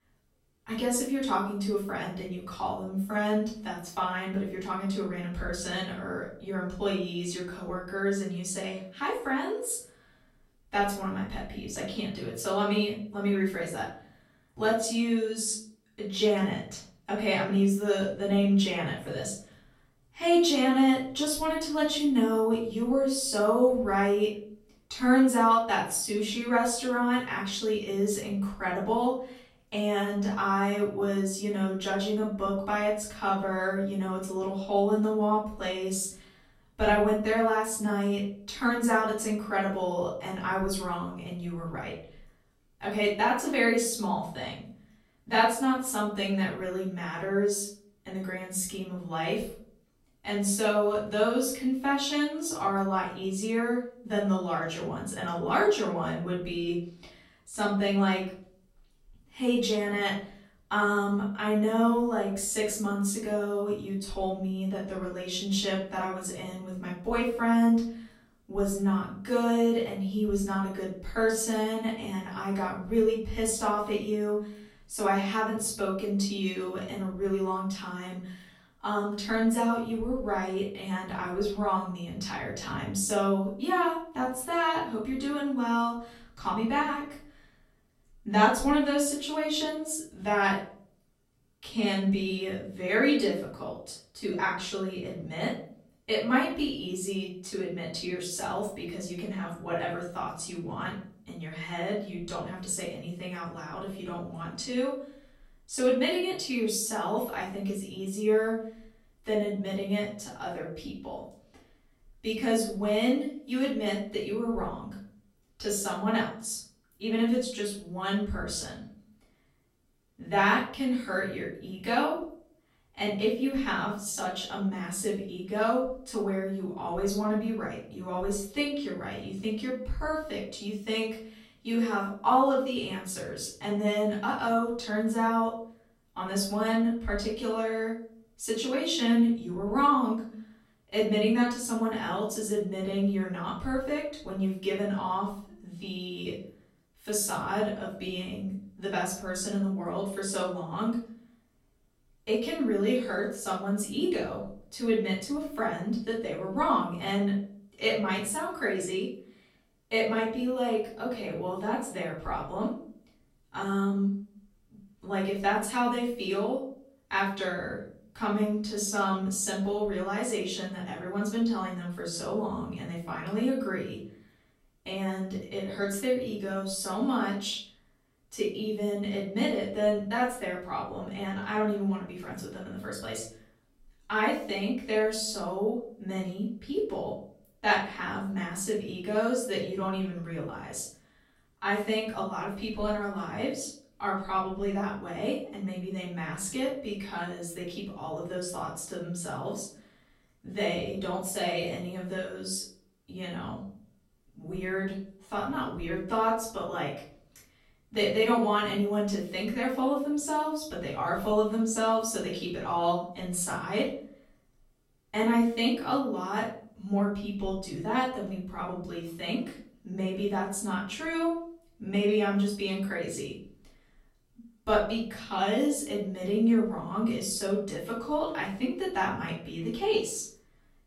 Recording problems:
off-mic speech; far
room echo; noticeable; dies away in 0.5 s

